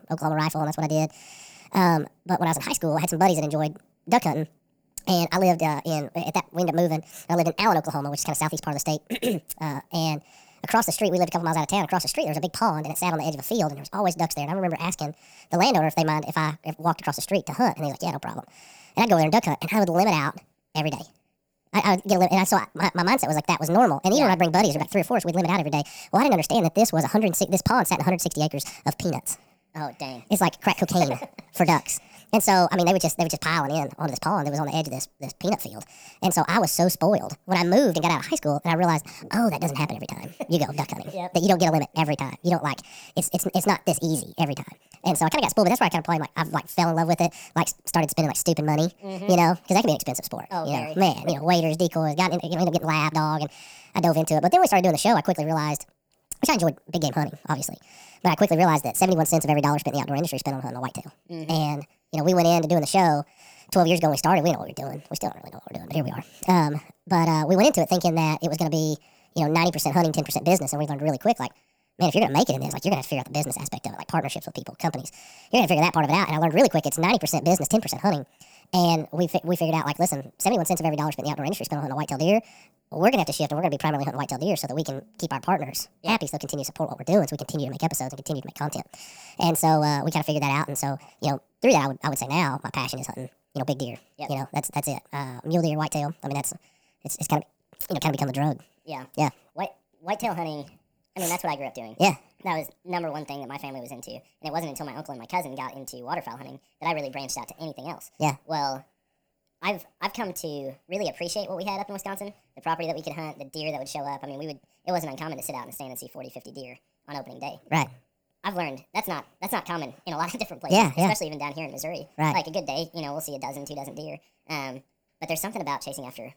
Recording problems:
wrong speed and pitch; too fast and too high; 1.6 times normal speed

